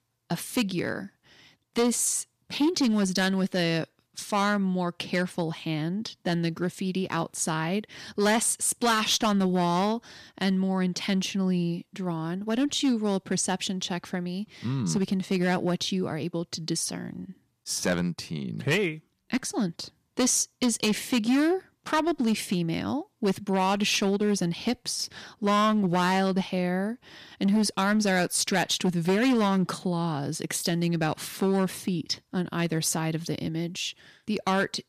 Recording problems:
distortion; slight; 6% of the sound clipped

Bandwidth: 14.5 kHz